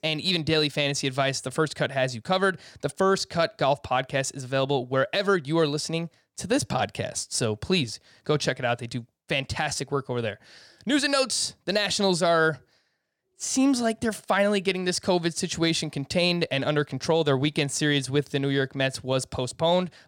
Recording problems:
none

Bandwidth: 17.5 kHz